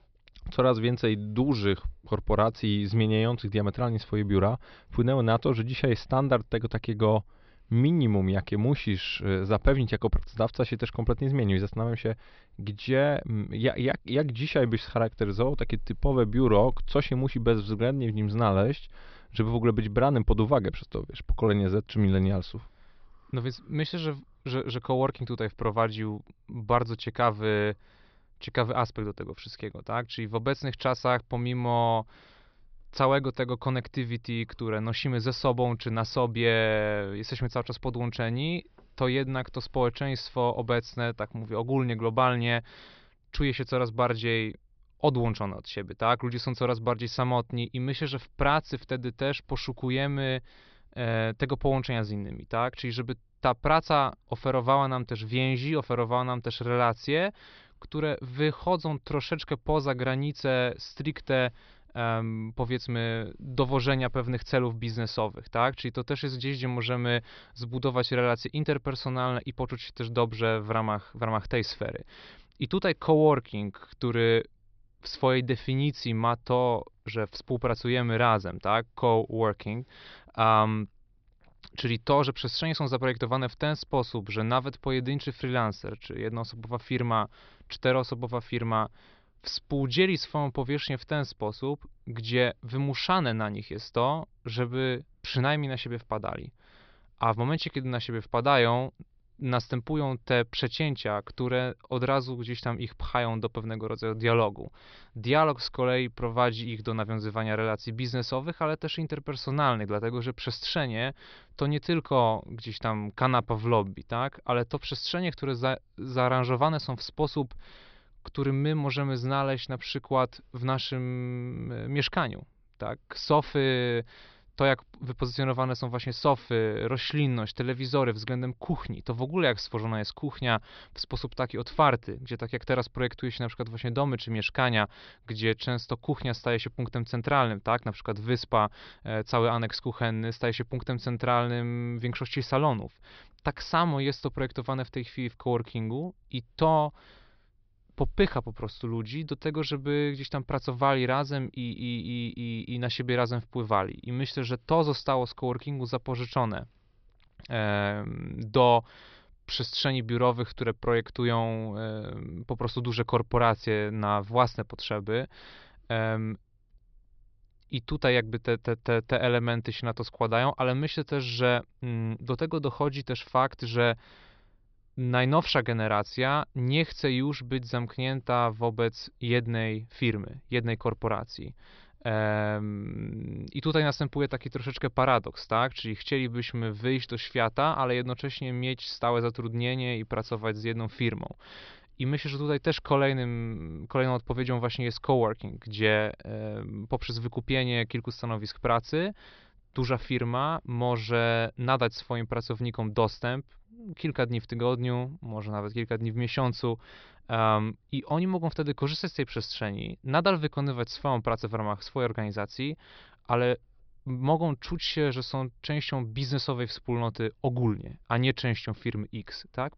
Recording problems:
high frequencies cut off; noticeable; nothing above 5.5 kHz

